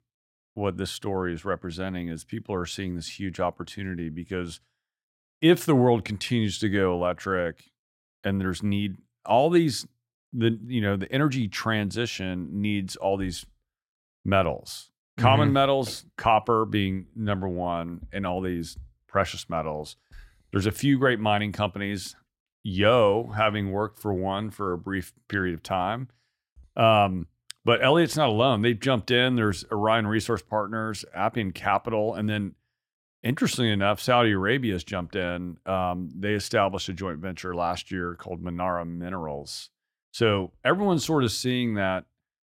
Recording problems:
none

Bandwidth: 16 kHz